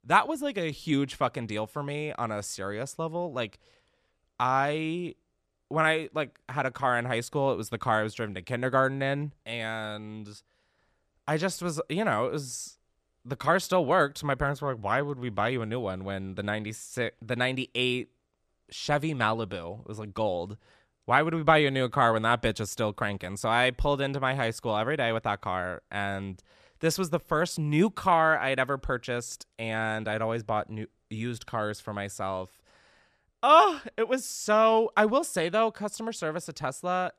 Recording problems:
none

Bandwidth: 14.5 kHz